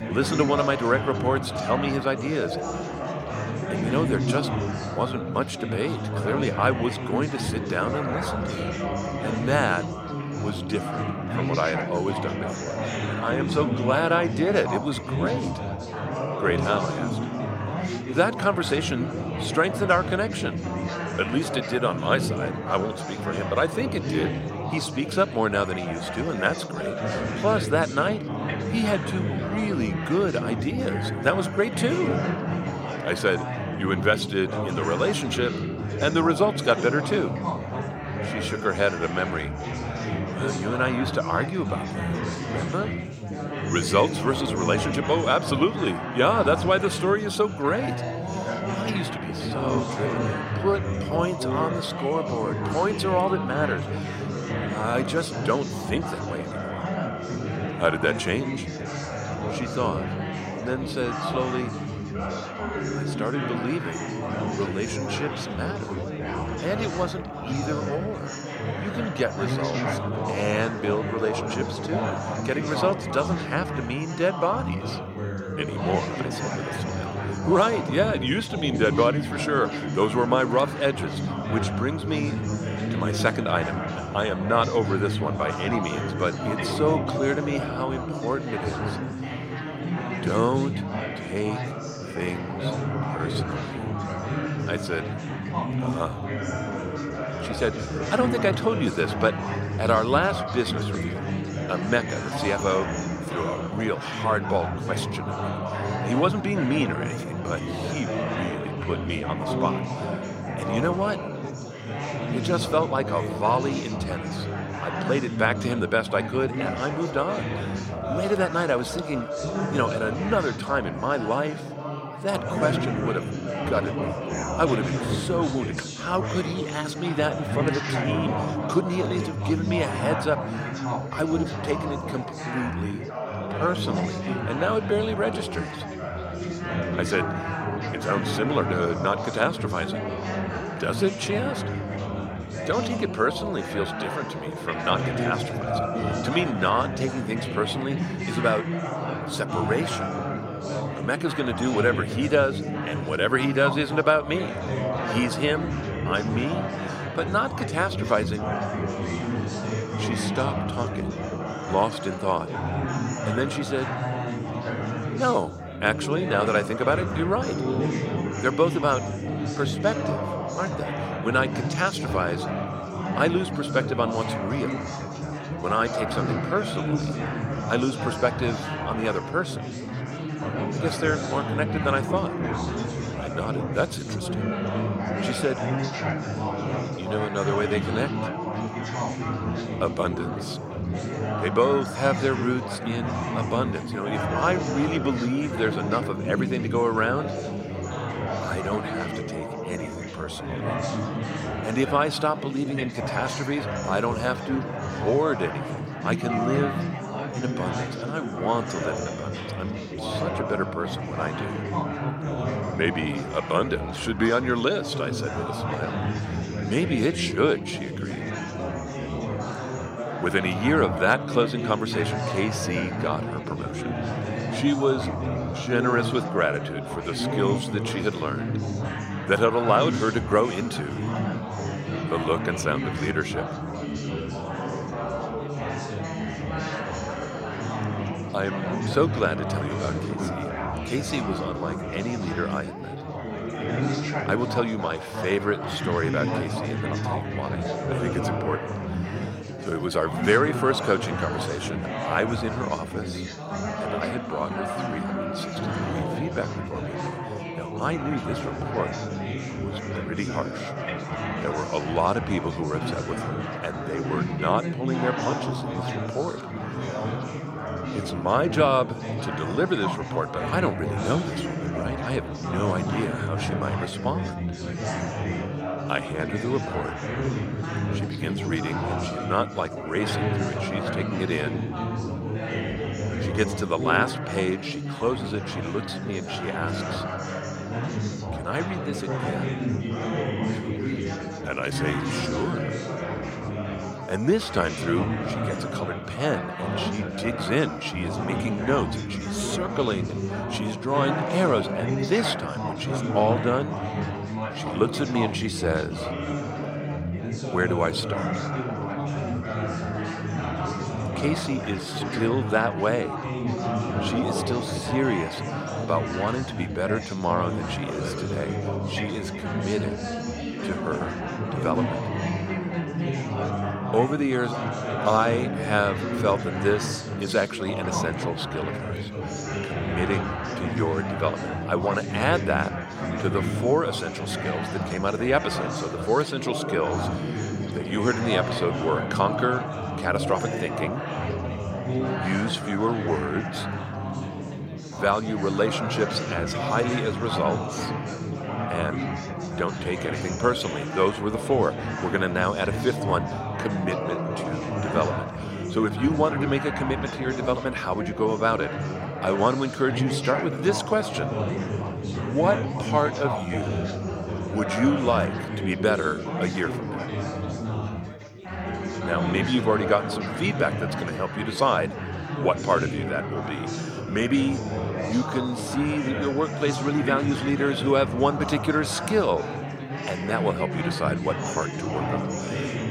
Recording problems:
chatter from many people; loud; throughout; 3 dB below the speech

